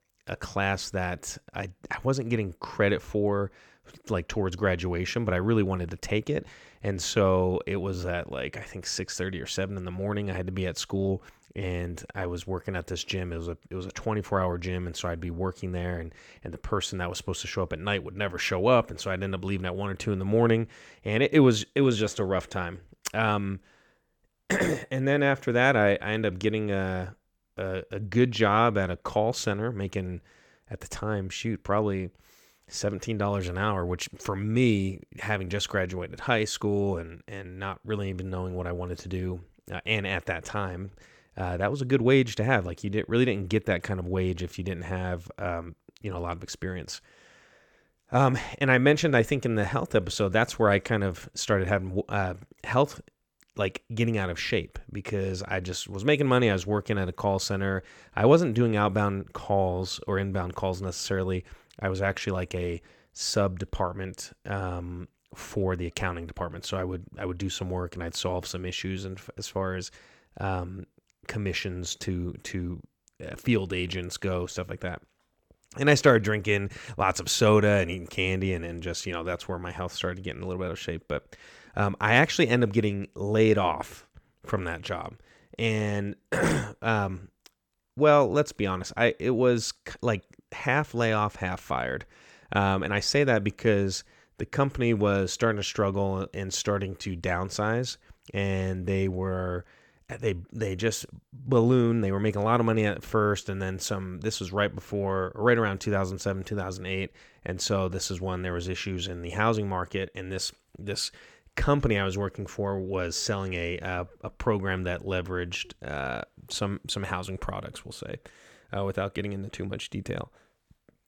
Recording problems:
none

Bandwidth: 18.5 kHz